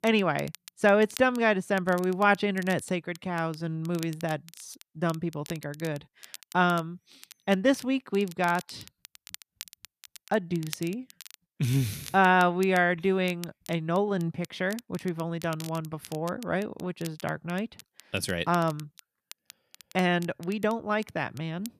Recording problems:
crackle, like an old record; noticeable; 20 dB below the speech

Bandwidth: 14.5 kHz